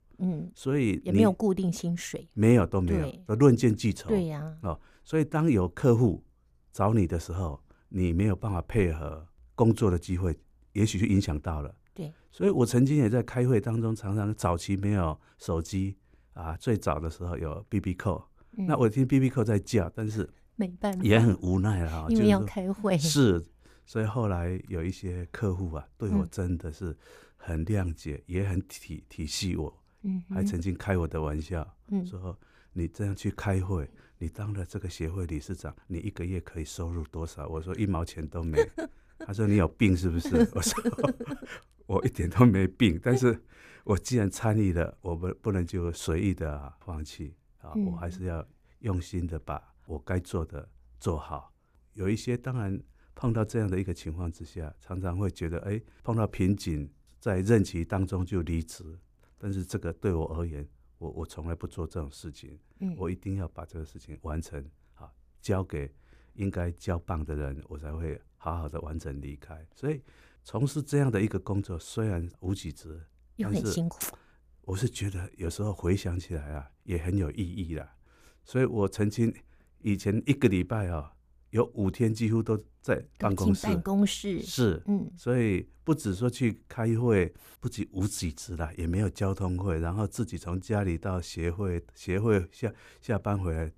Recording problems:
none

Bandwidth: 15 kHz